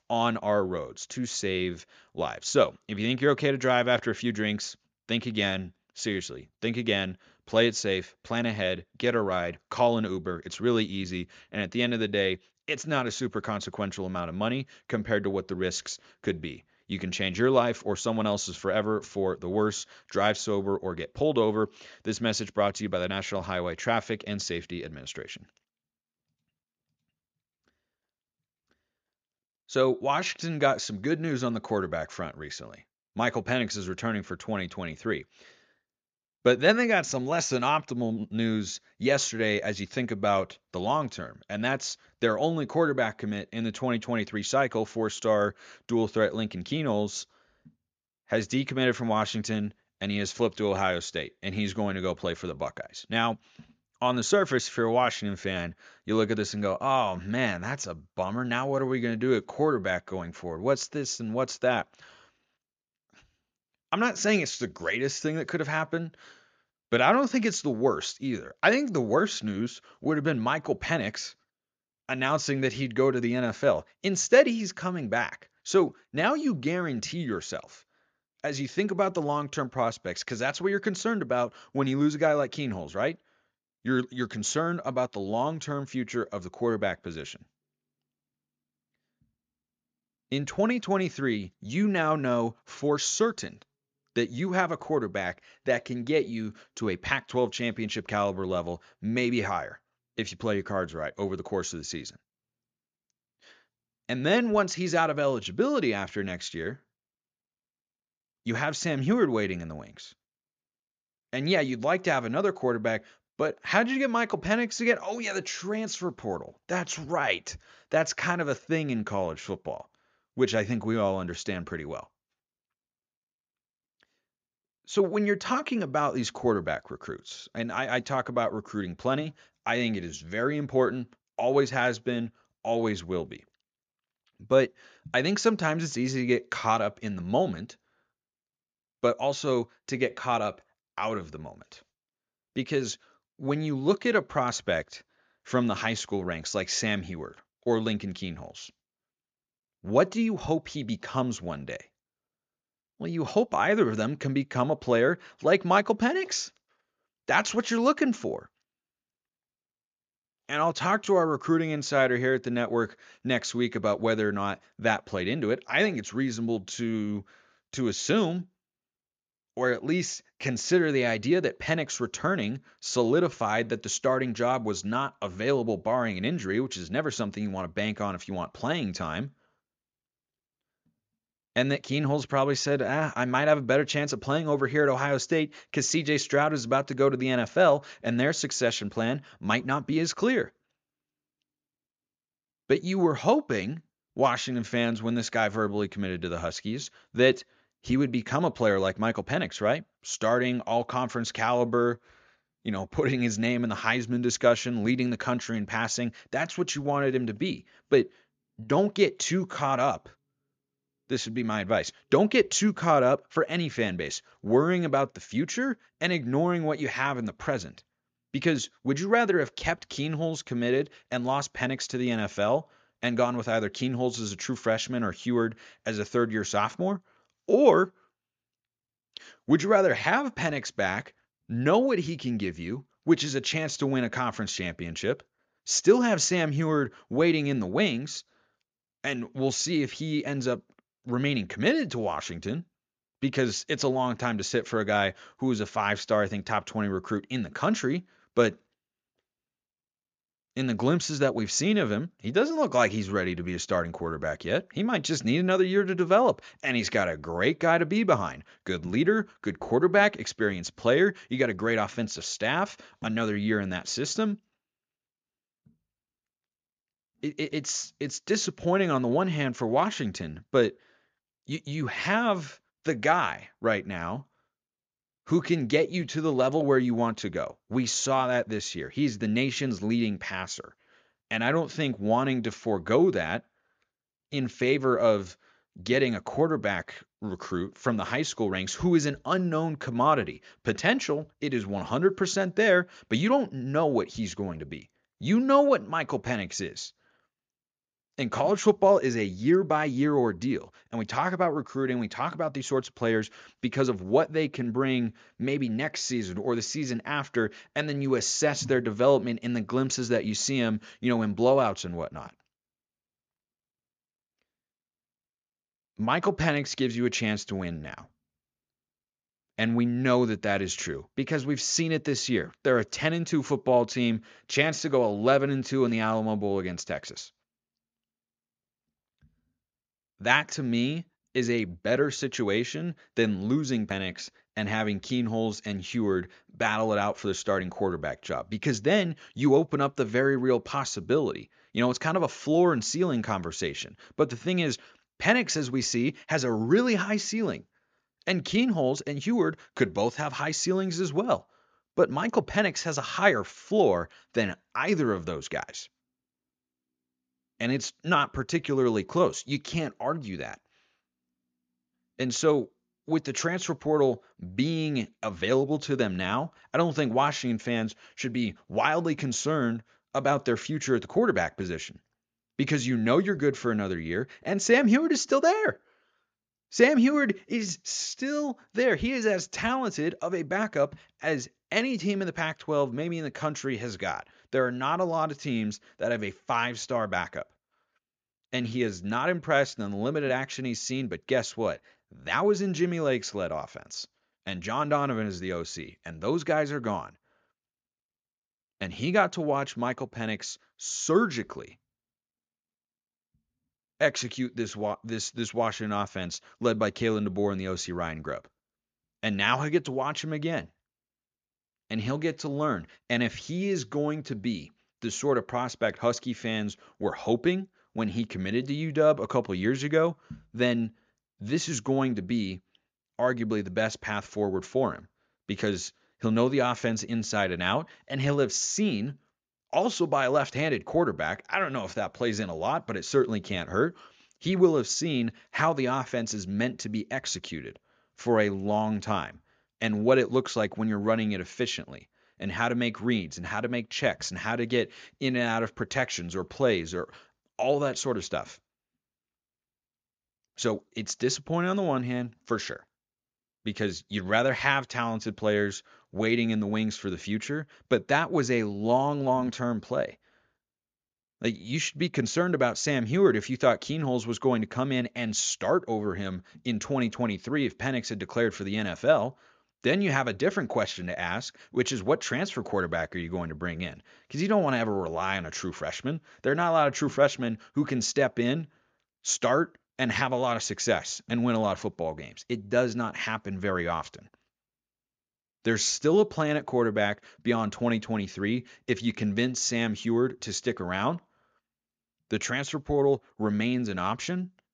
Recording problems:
none

